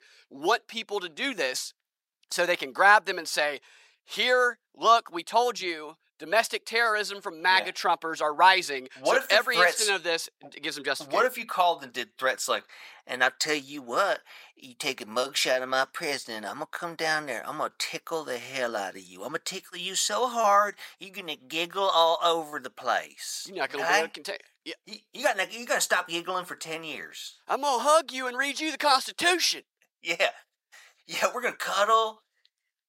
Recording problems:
thin; very; fading below 750 Hz

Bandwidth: 16 kHz